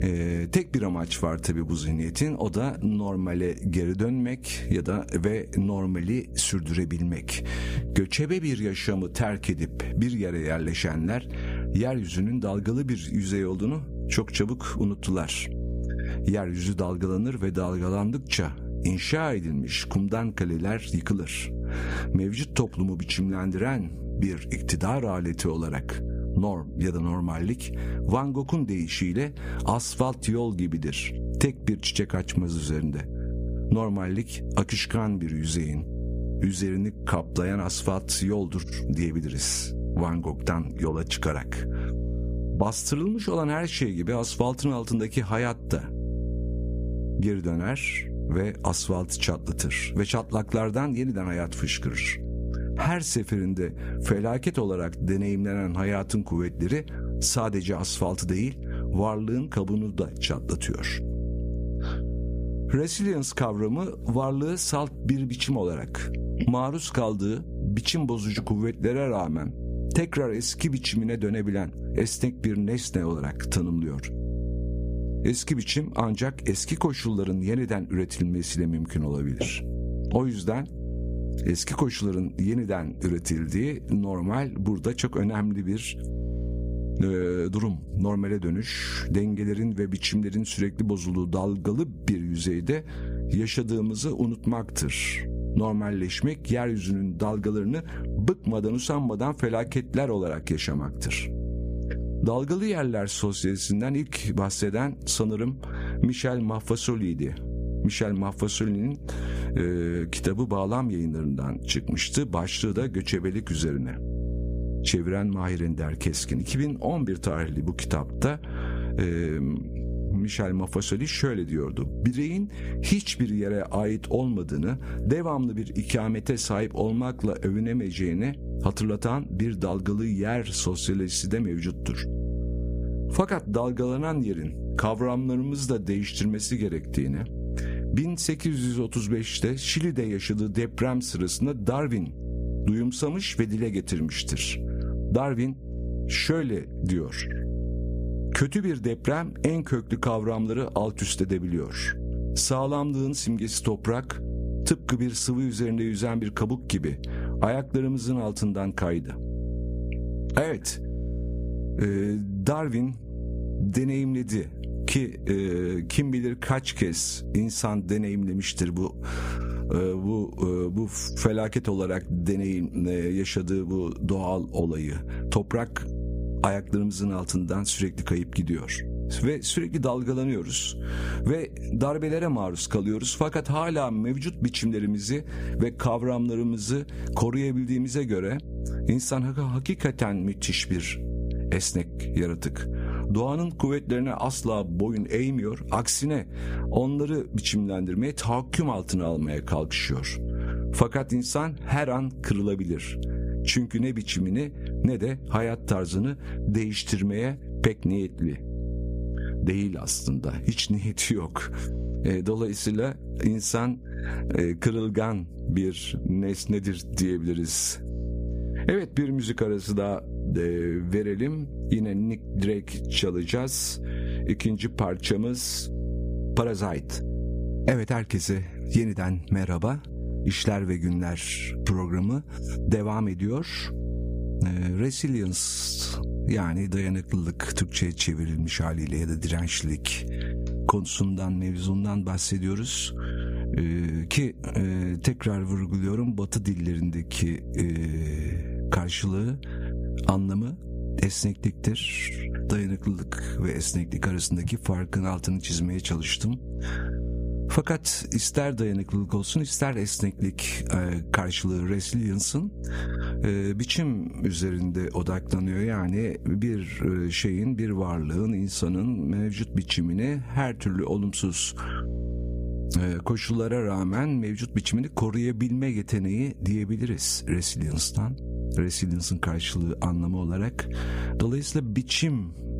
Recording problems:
squashed, flat; somewhat
electrical hum; noticeable; throughout; 60 Hz, 15 dB below the speech

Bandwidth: 15 kHz